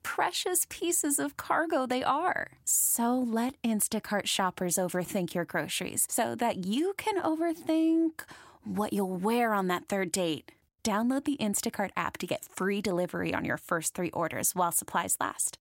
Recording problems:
none

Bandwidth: 16 kHz